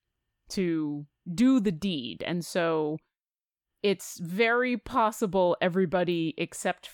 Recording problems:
none

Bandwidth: 17.5 kHz